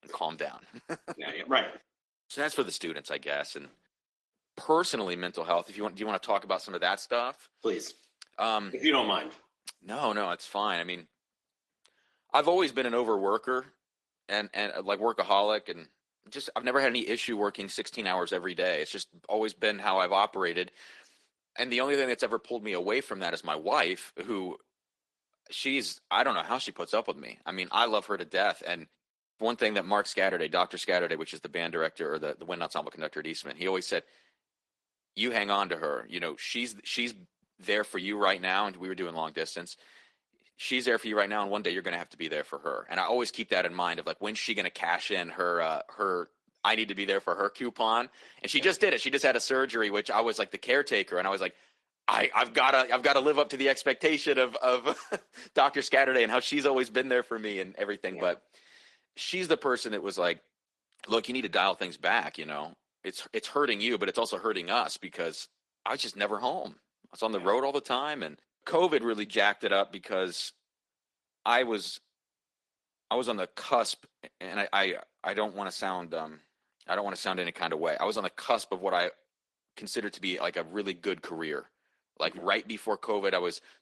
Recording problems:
thin; somewhat; fading below 450 Hz
garbled, watery; slightly; nothing above 11.5 kHz

